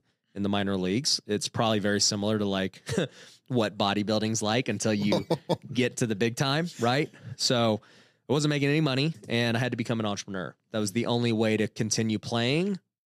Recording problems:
none

